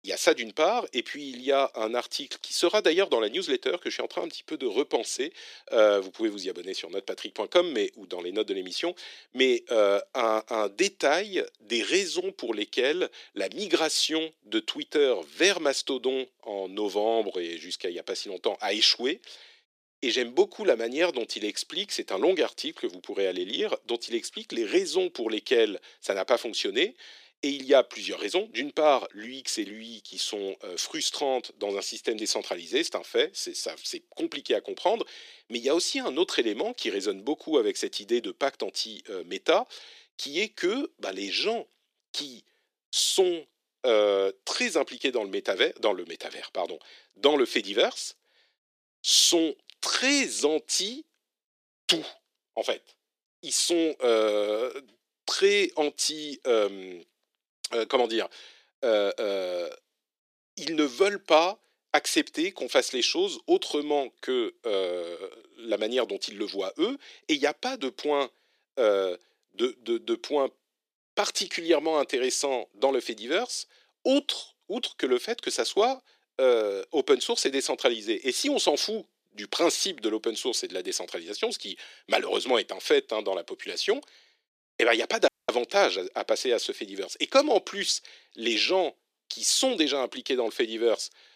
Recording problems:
thin; very; fading below 350 Hz
audio cutting out; at 1:25

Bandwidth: 14.5 kHz